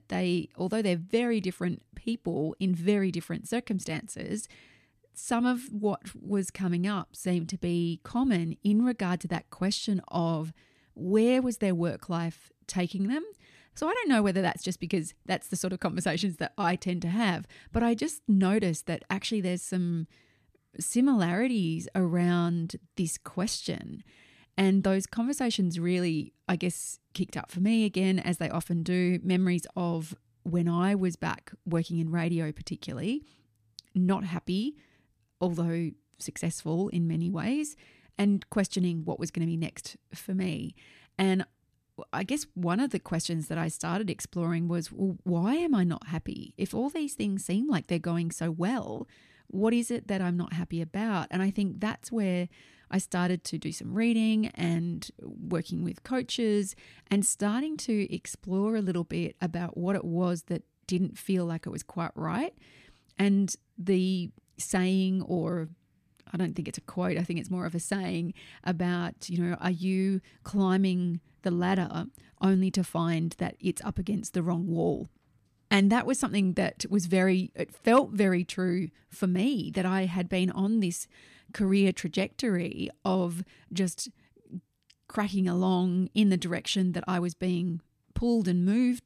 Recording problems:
none

